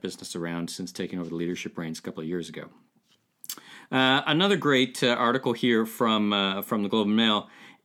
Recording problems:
none

